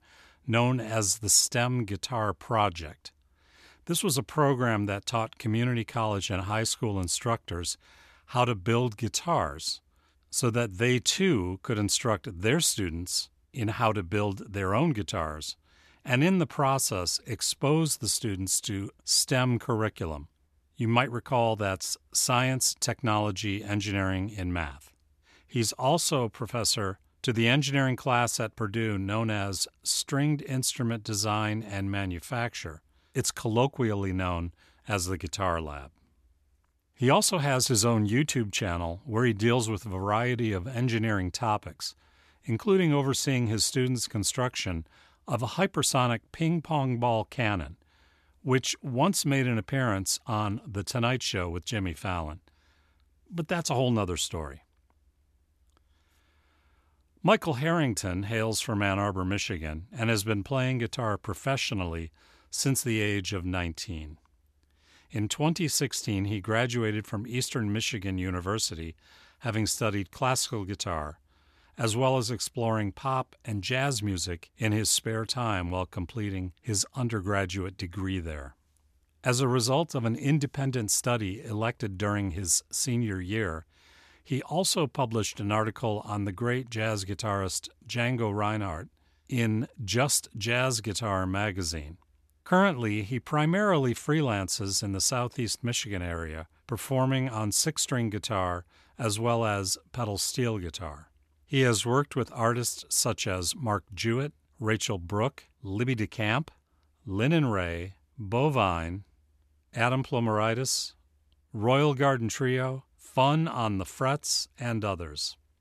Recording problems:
none

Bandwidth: 13.5 kHz